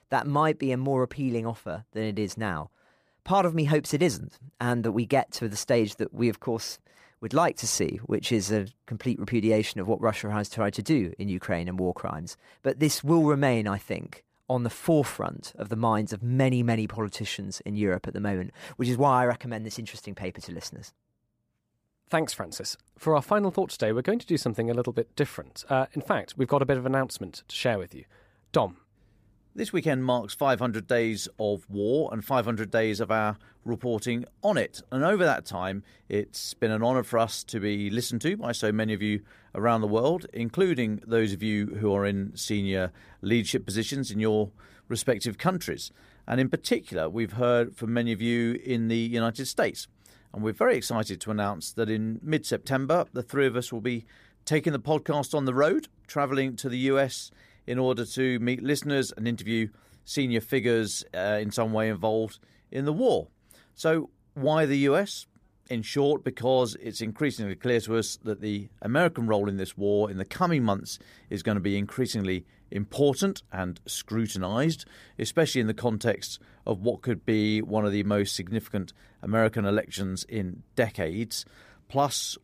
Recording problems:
none

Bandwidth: 15 kHz